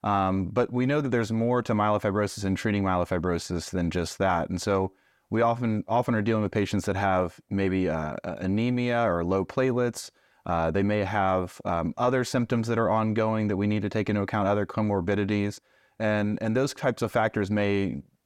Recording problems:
none

